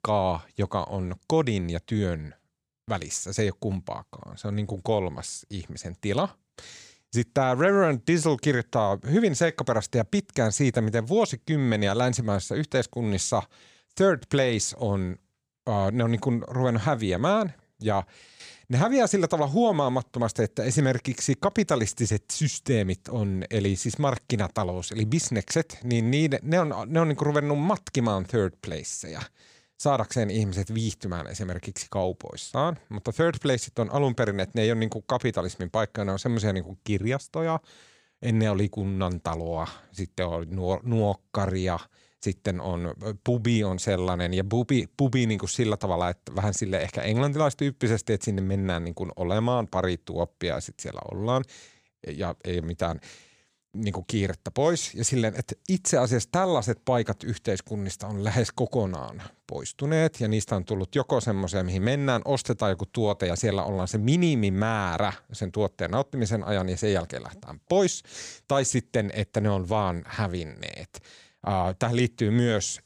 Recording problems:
none

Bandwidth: 15 kHz